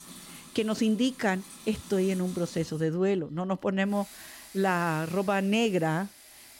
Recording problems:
household noises; noticeable; throughout; 20 dB below the speech

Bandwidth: 16 kHz